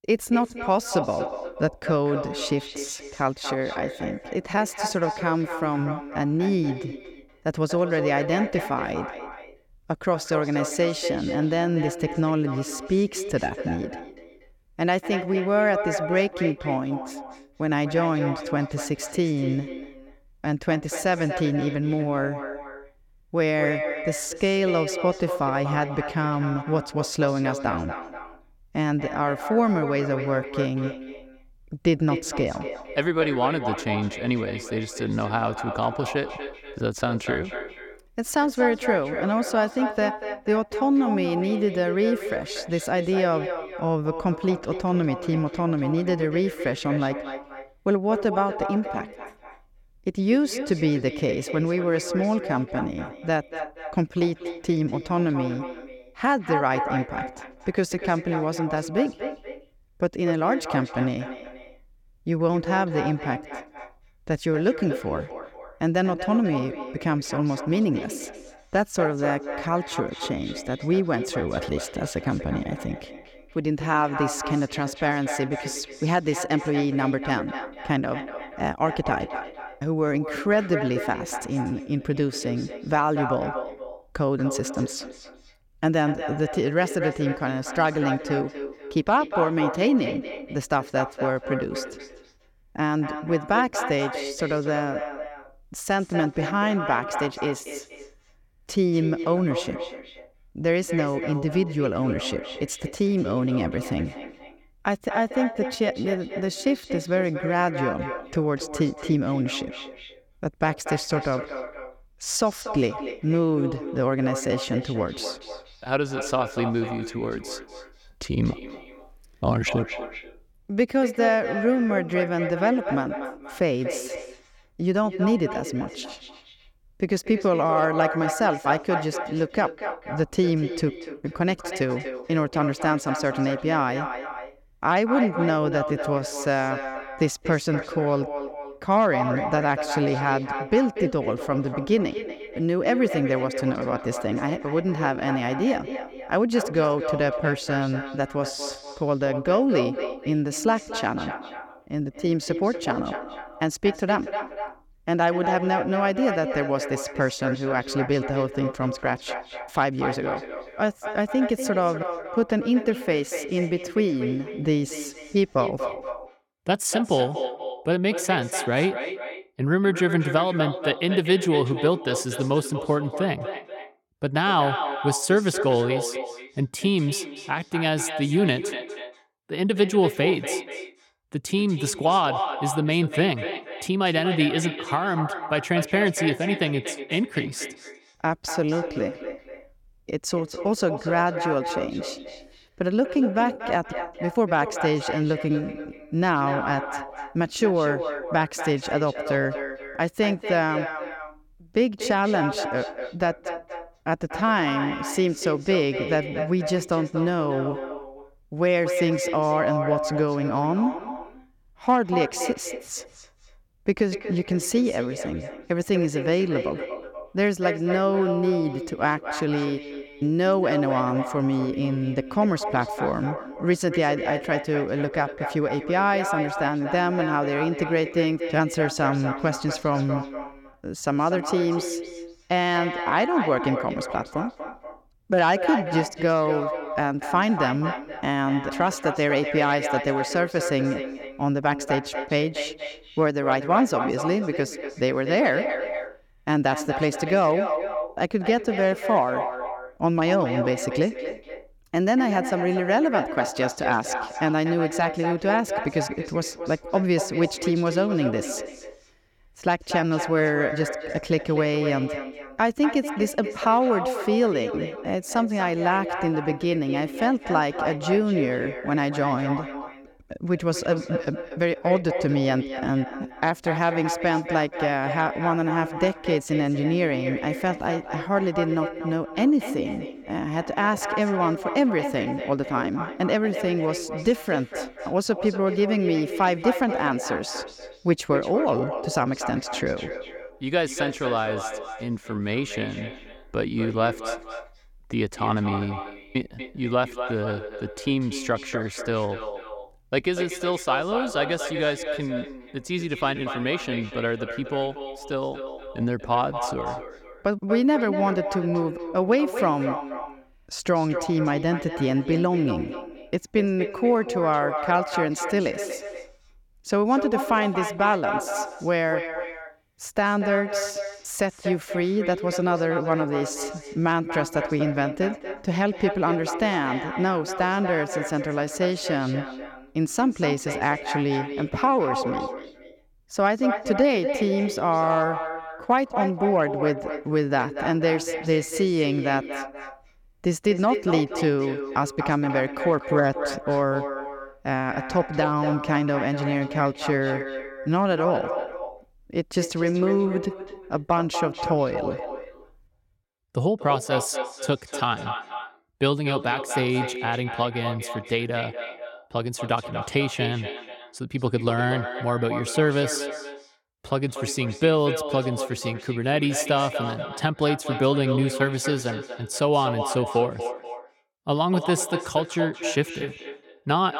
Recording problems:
echo of what is said; strong; throughout; 240 ms later, 8 dB below the speech

